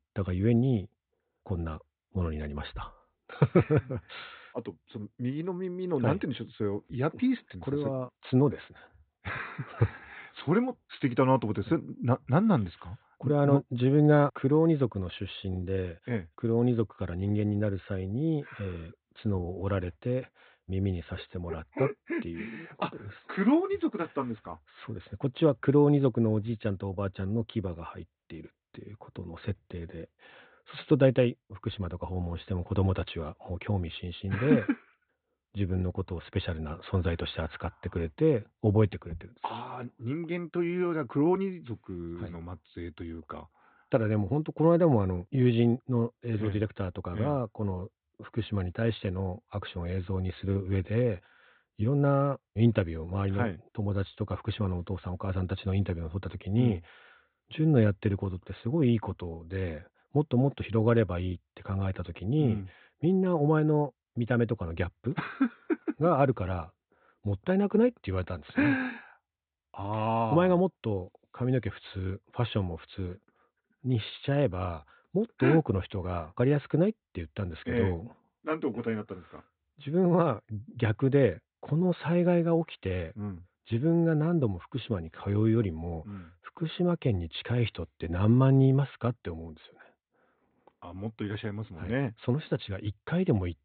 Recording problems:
high frequencies cut off; severe; nothing above 4 kHz

